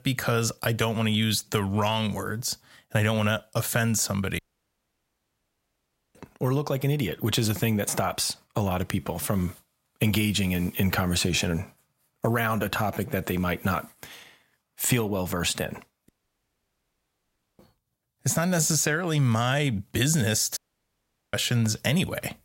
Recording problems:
audio cutting out; at 4.5 s for 2 s, at 16 s for 1.5 s and at 21 s for 1 s

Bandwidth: 16 kHz